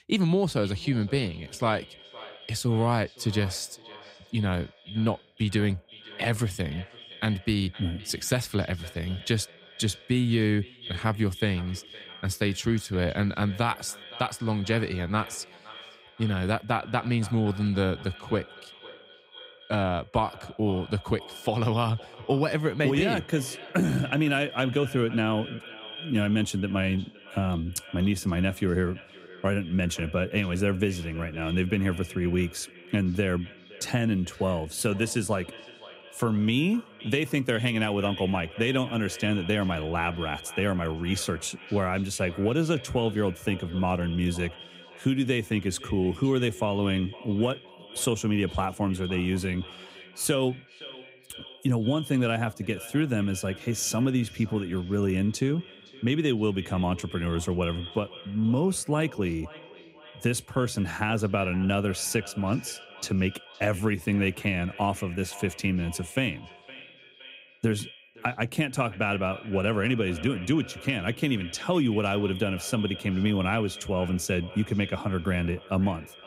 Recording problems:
echo of what is said; noticeable; throughout; 520 ms later, 15 dB below the speech

